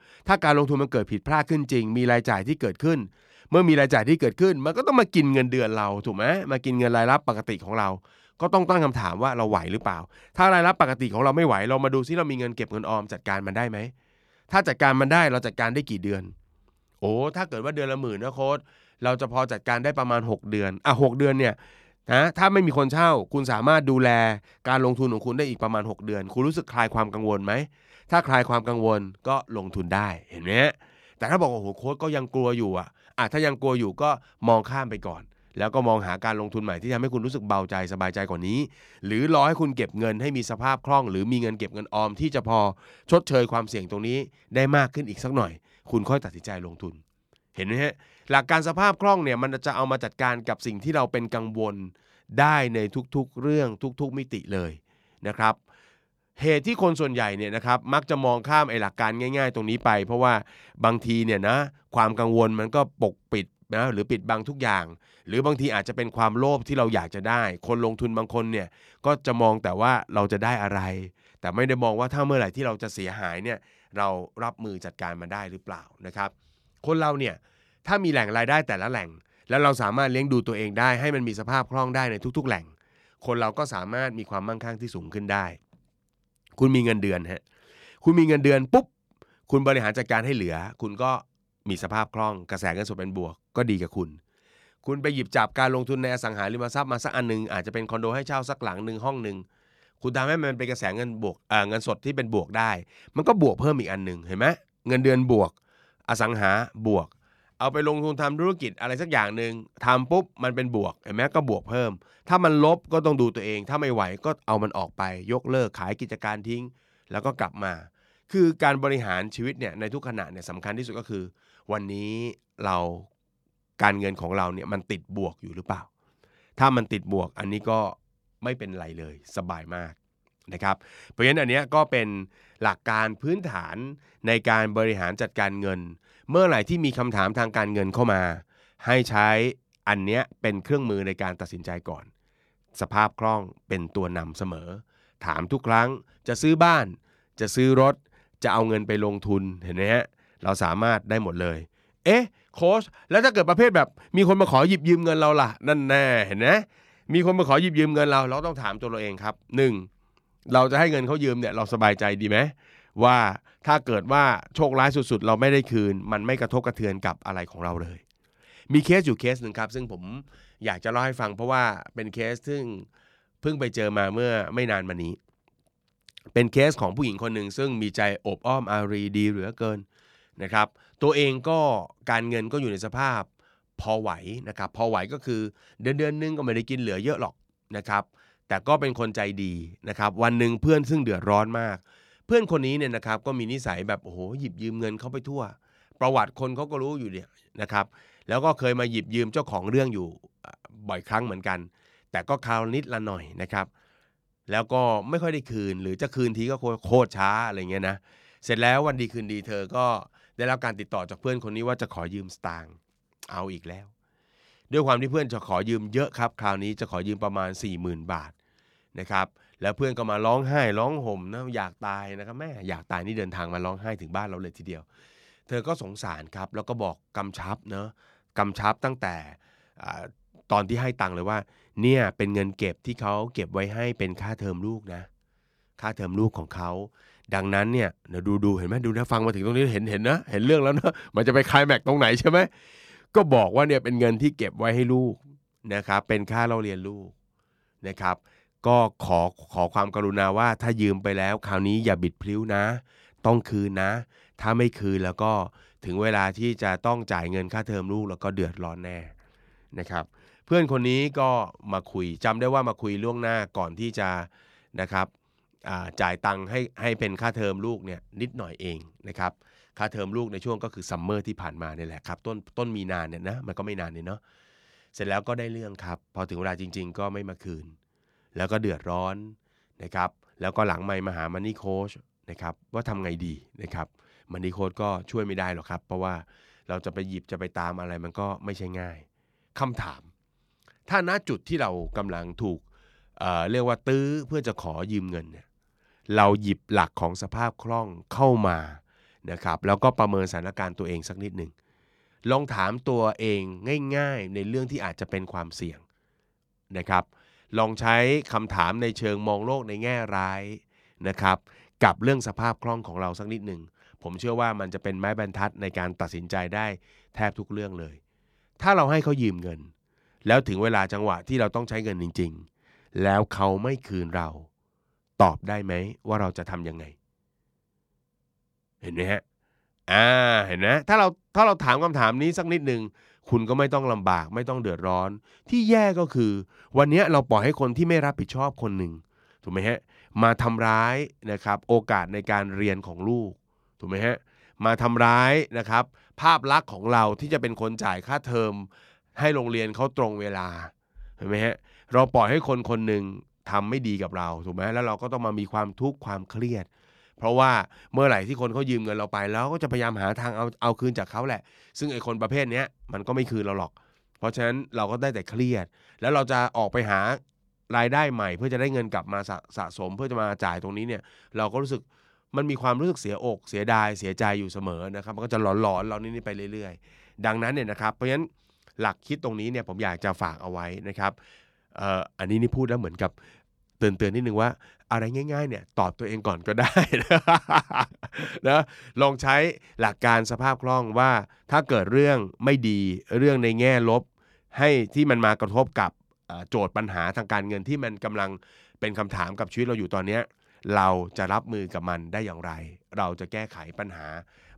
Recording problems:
none

